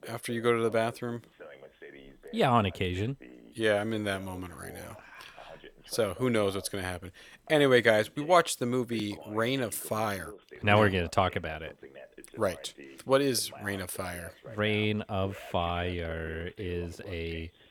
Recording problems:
voice in the background; faint; throughout; 20 dB below the speech

